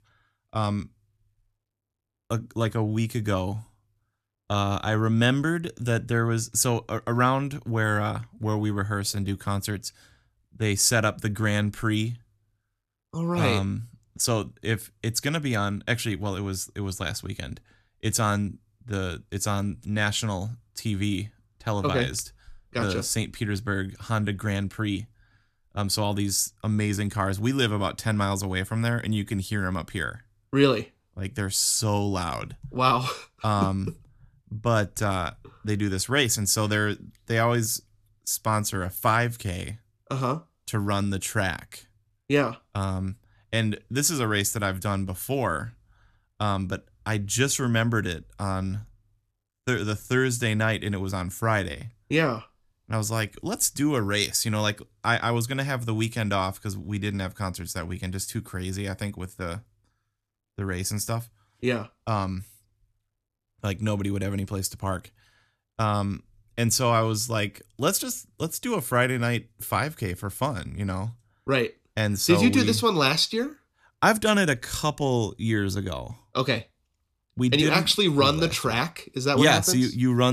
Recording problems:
abrupt cut into speech; at the end

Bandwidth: 14 kHz